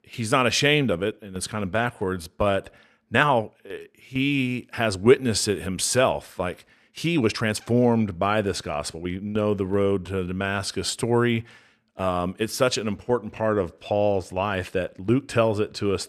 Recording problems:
uneven, jittery; strongly; from 1 to 14 s

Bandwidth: 13.5 kHz